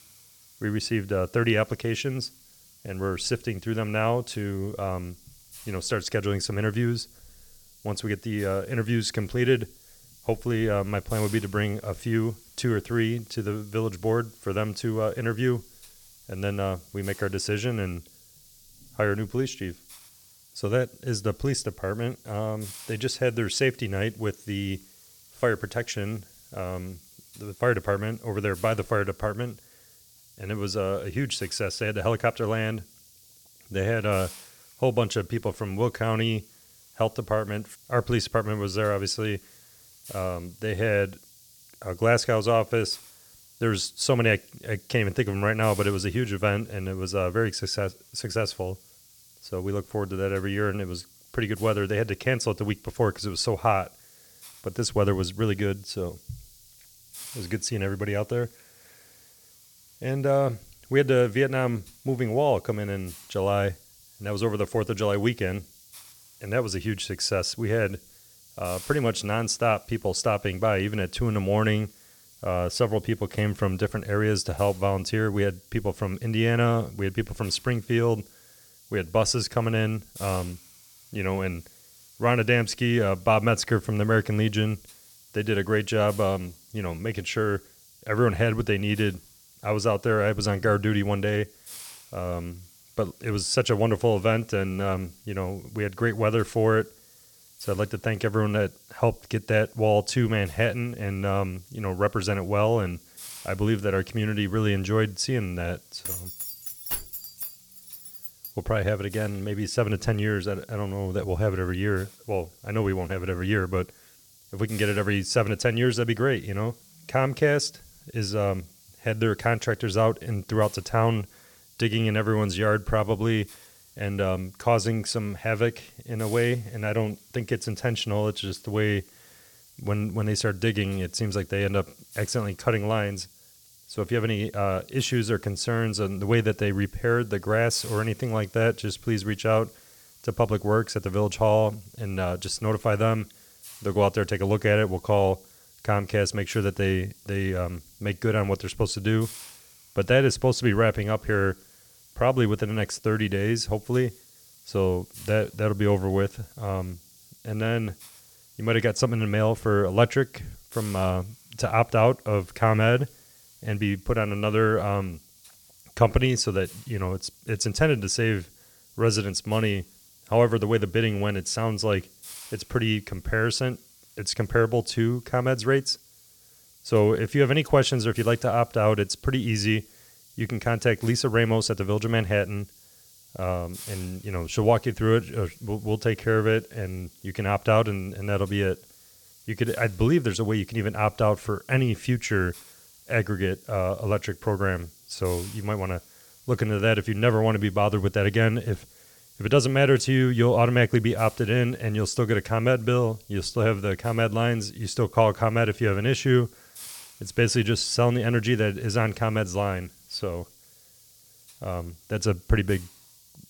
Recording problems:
hiss; faint; throughout; 25 dB below the speech
jangling keys; noticeable; from 1:46 to 1:48; peak 4 dB below the speech

